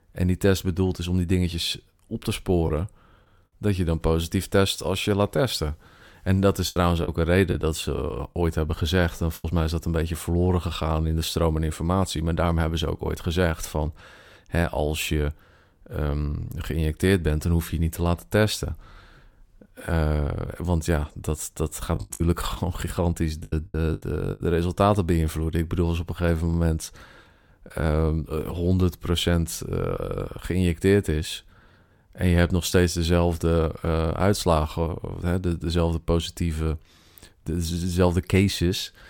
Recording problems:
choppy; very; from 6.5 to 9.5 s and from 22 to 24 s; 9% of the speech affected

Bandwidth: 17 kHz